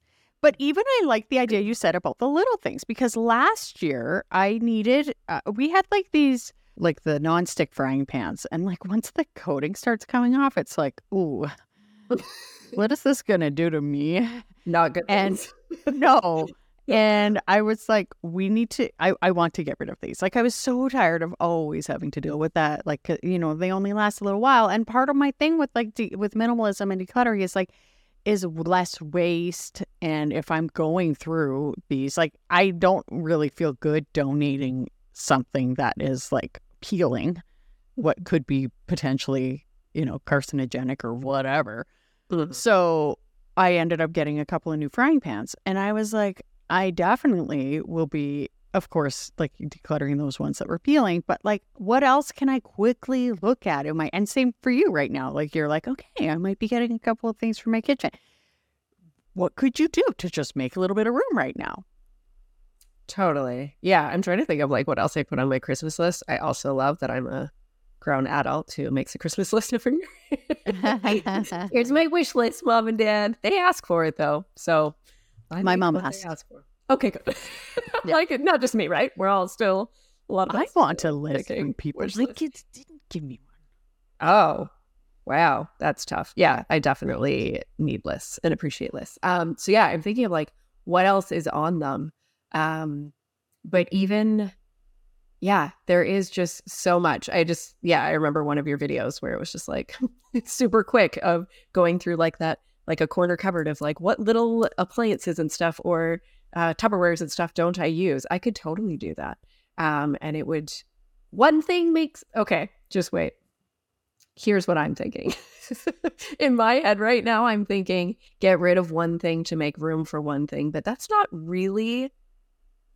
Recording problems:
none

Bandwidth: 17 kHz